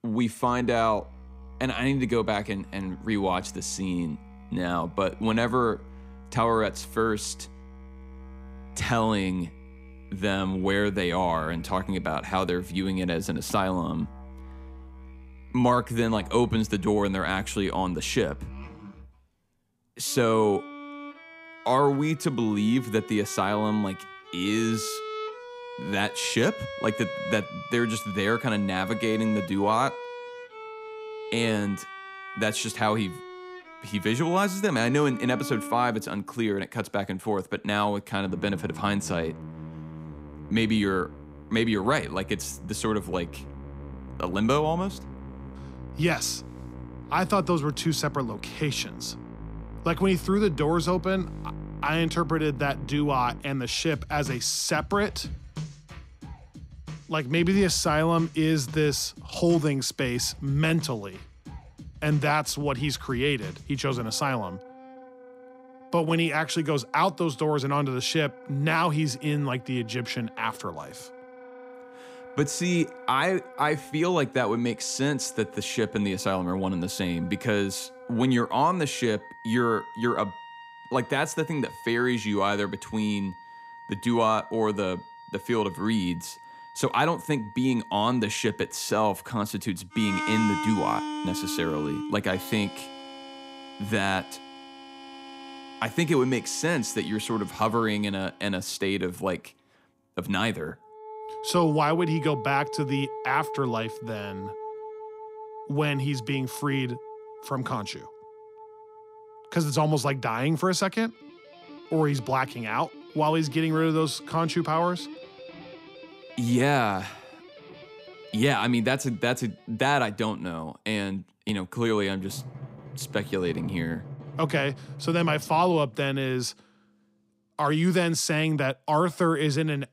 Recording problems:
background music; noticeable; throughout; 15 dB below the speech

